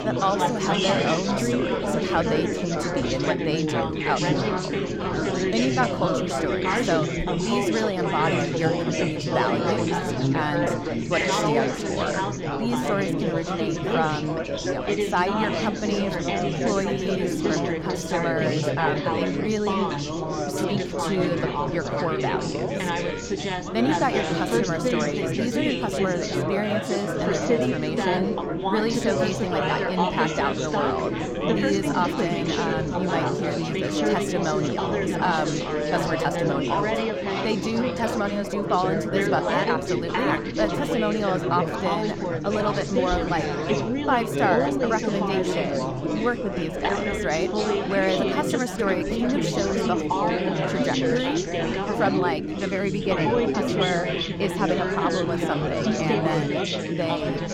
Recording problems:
chatter from many people; very loud; throughout; 3 dB above the speech

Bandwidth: 17.5 kHz